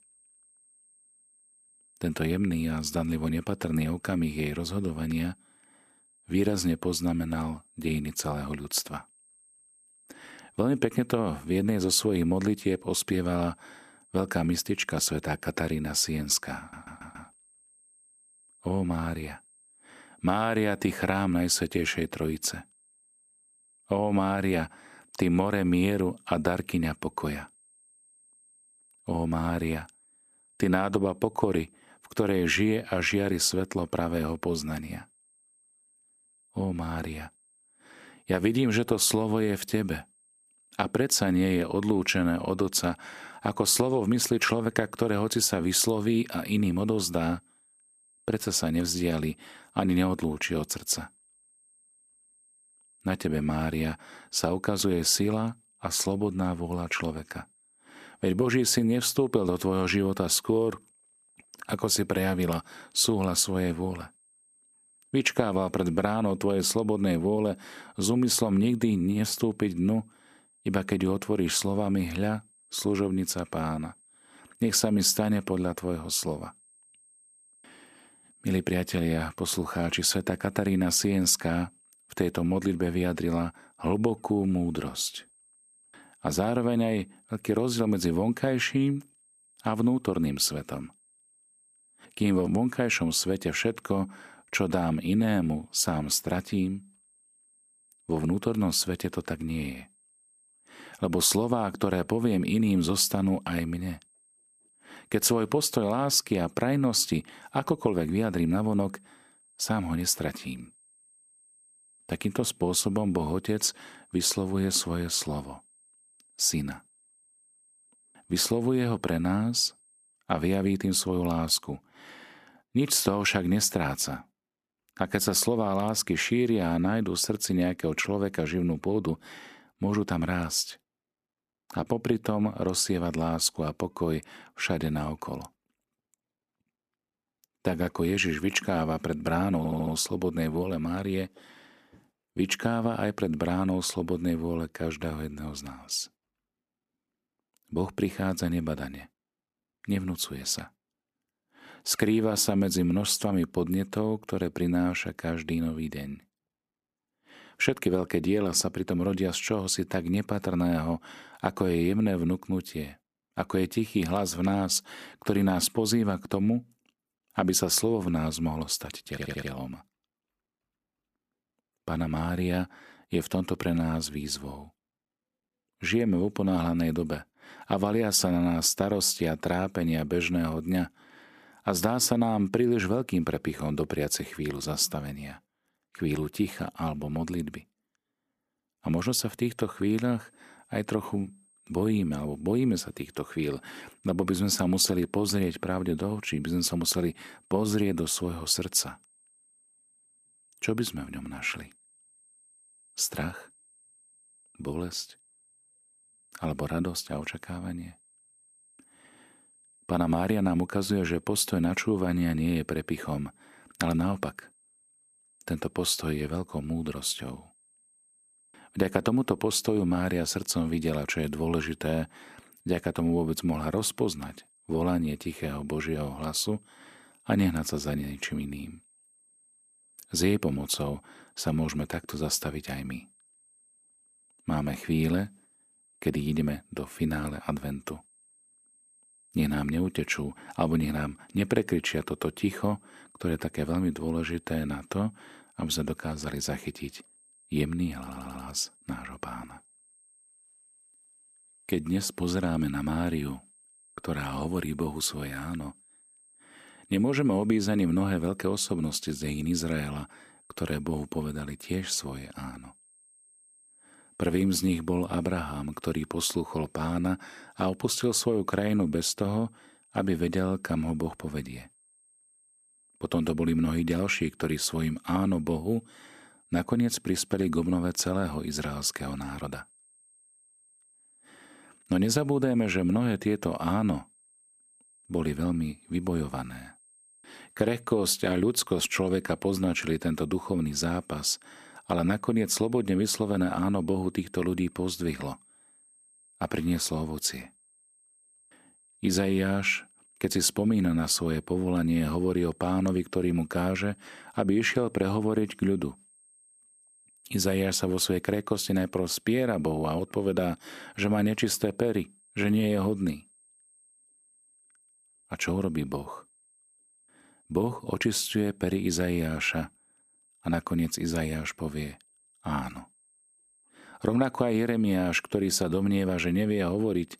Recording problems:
high-pitched whine; faint; until 2:00 and from 3:10 on; 8.5 kHz, 30 dB below the speech
audio stuttering; 4 times, first at 17 s

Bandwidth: 14.5 kHz